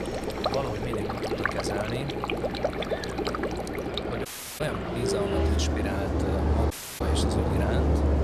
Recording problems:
rain or running water; very loud; throughout; 2 dB above the speech
train or aircraft noise; very loud; throughout; 5 dB above the speech
electrical hum; loud; throughout; 60 Hz, 7 dB below the speech
animal sounds; faint; throughout; 20 dB below the speech
audio cutting out; at 4.5 s and at 6.5 s

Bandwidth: 13.5 kHz